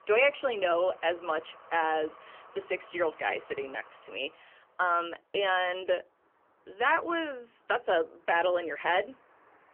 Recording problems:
phone-call audio; poor line; nothing above 3 kHz
traffic noise; faint; throughout; 25 dB below the speech

